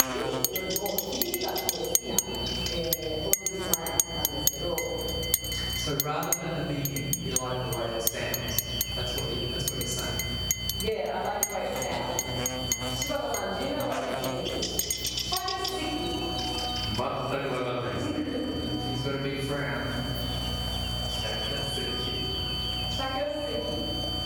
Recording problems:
room echo; strong; dies away in 1.5 s
off-mic speech; far
squashed, flat; somewhat
household noises; very loud; throughout; 2 dB above the speech
electrical hum; loud; throughout; 60 Hz, 5 dB below the speech
high-pitched whine; loud; throughout; 3 kHz, 1 dB below the speech

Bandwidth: 18.5 kHz